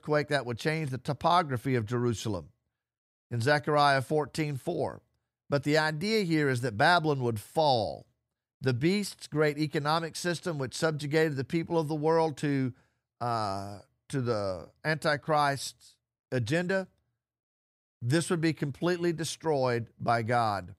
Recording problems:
none

